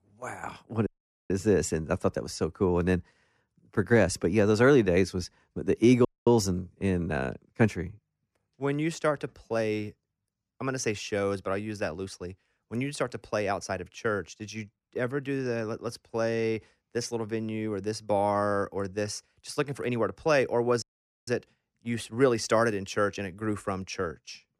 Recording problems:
audio cutting out; at 1 s, at 6 s and at 21 s

